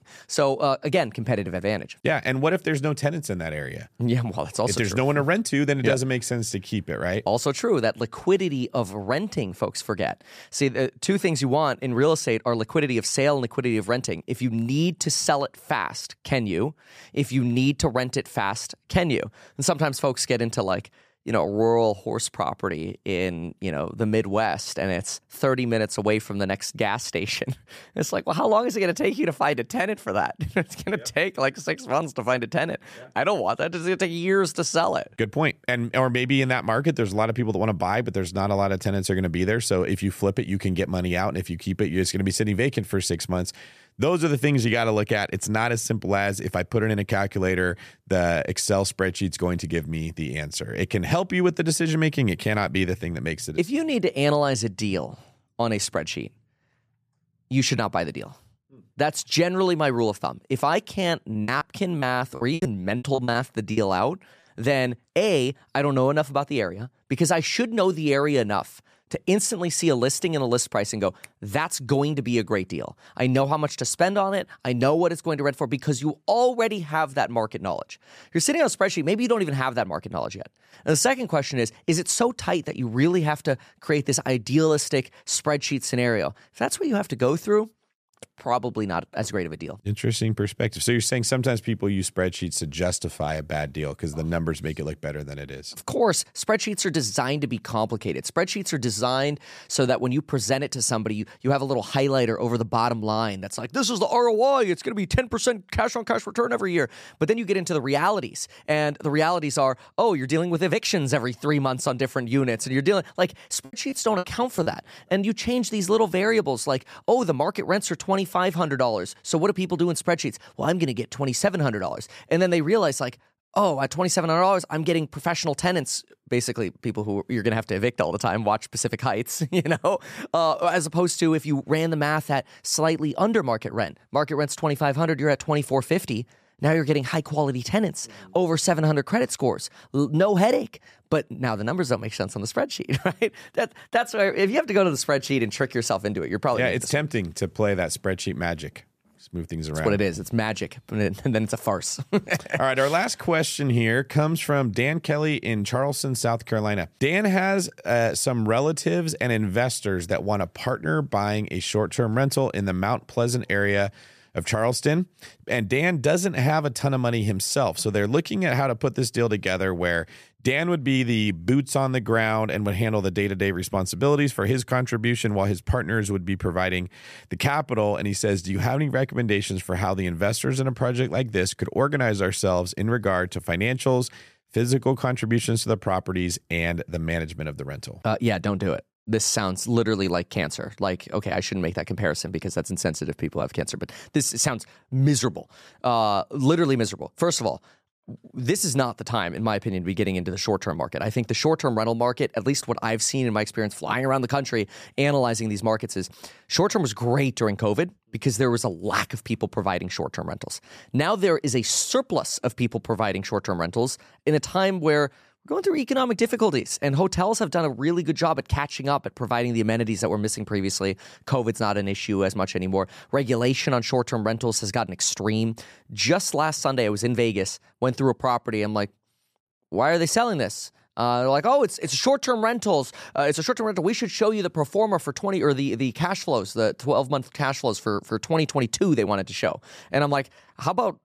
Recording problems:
choppy; very; from 1:01 to 1:04 and from 1:52 to 1:55; 11% of the speech affected

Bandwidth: 14.5 kHz